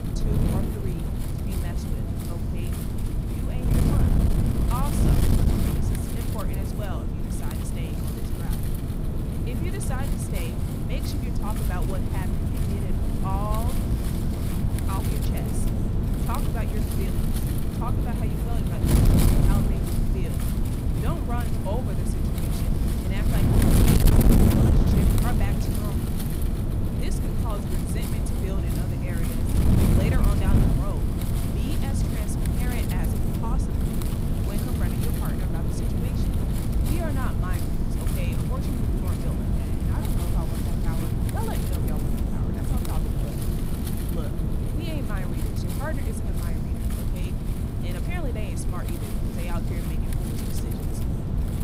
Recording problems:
wind noise on the microphone; heavy; 4 dB above the speech

